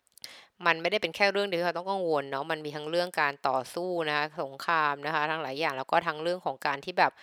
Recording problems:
thin; very; fading below 450 Hz

